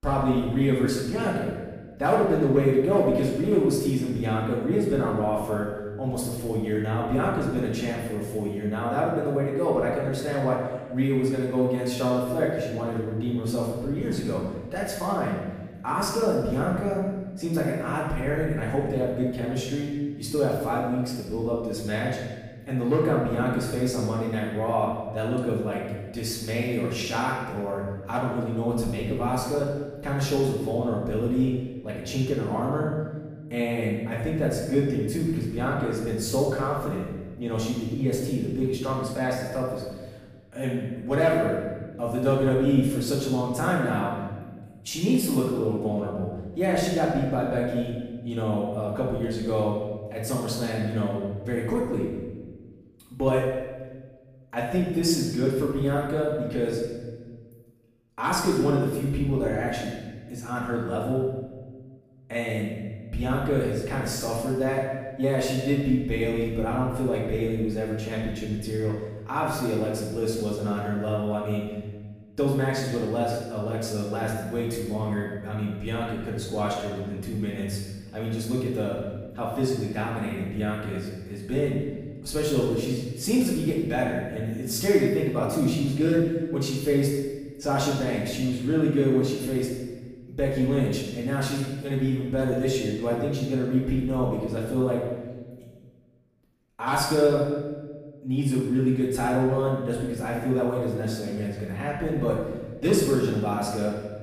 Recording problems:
off-mic speech; far
room echo; noticeable; dies away in 1.2 s

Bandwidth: 15 kHz